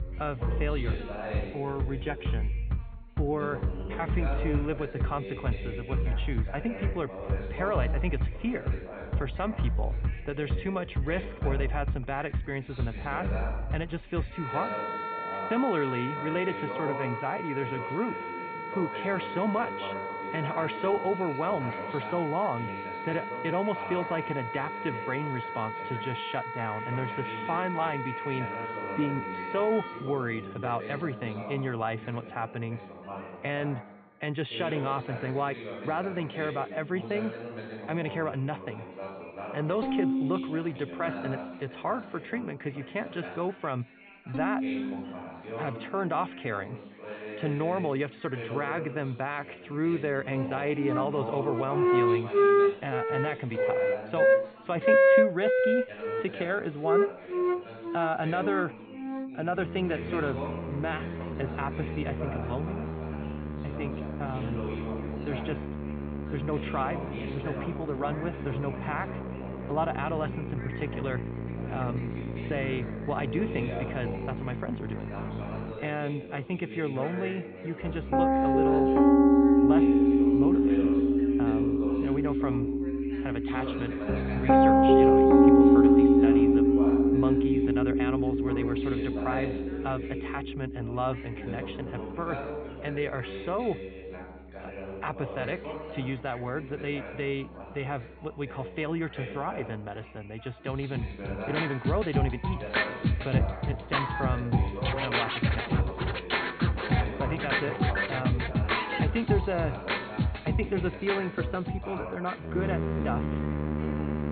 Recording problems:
high frequencies cut off; severe; nothing above 4.5 kHz
background music; very loud; throughout; 5 dB above the speech
background chatter; loud; throughout; 3 voices, 8 dB below the speech

